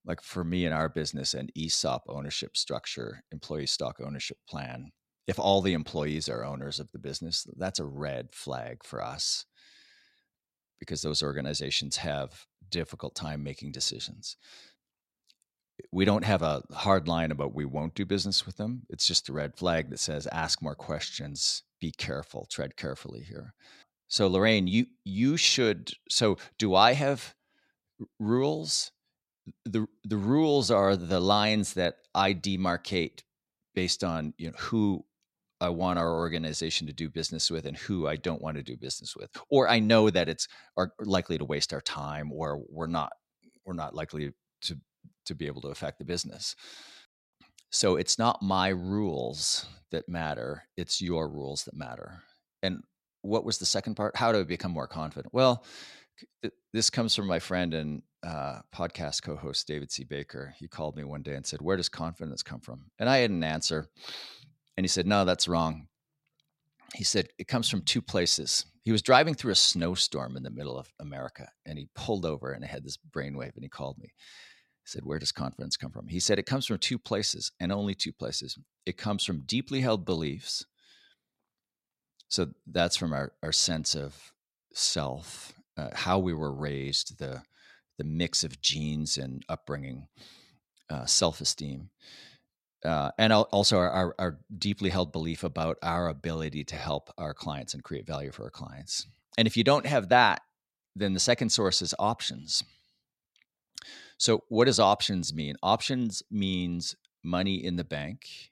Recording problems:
none

